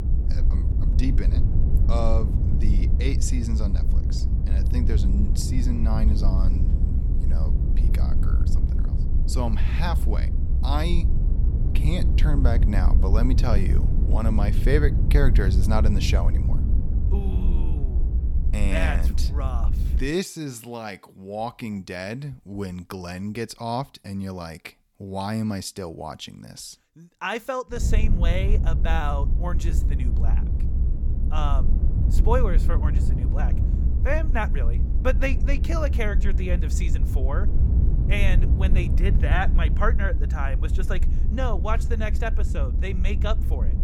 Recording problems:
low rumble; loud; until 20 s and from 28 s on; 8 dB below the speech

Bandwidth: 18 kHz